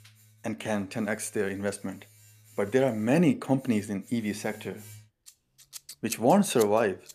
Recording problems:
household noises; noticeable; throughout; 20 dB below the speech

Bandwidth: 14.5 kHz